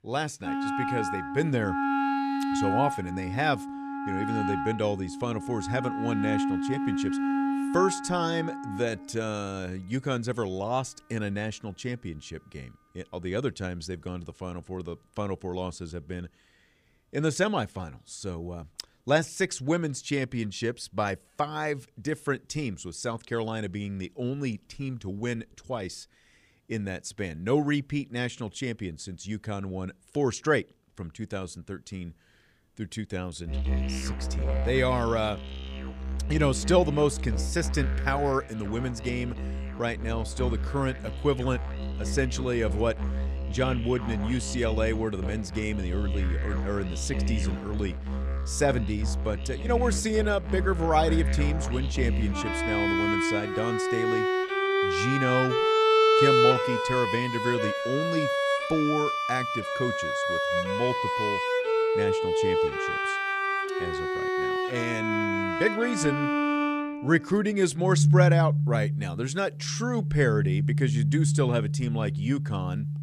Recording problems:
background music; very loud; throughout; 2 dB above the speech

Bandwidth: 15 kHz